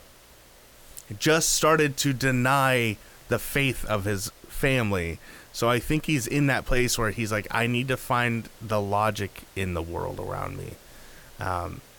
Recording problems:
hiss; faint; throughout; 25 dB below the speech

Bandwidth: 18.5 kHz